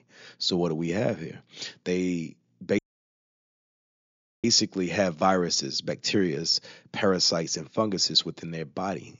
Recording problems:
high frequencies cut off; noticeable; nothing above 7 kHz
audio cutting out; at 3 s for 1.5 s

